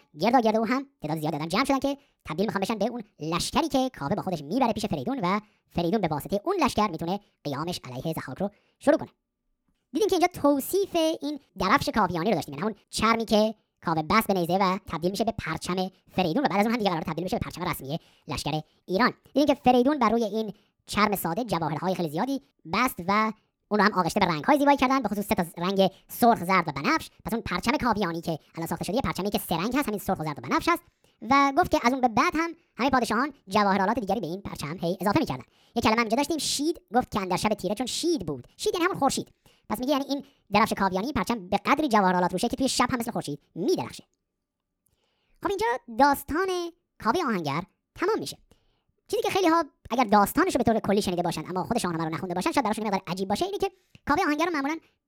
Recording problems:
wrong speed and pitch; too fast and too high; 1.6 times normal speed

